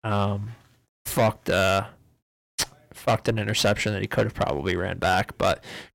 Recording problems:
distortion; heavy; 6% of the sound clipped

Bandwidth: 16.5 kHz